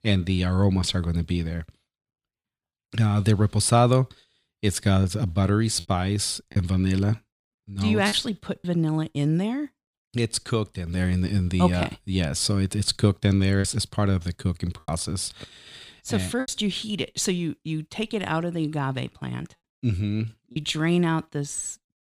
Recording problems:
choppy; occasionally; 2% of the speech affected

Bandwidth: 15 kHz